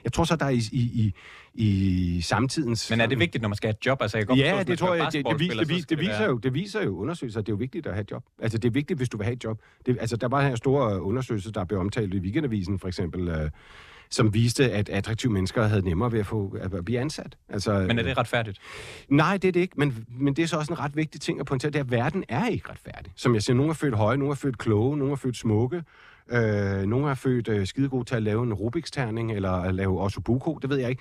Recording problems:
none

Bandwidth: 14.5 kHz